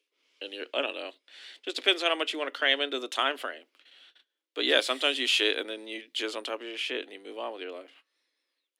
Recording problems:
thin; very slightly; fading below 250 Hz

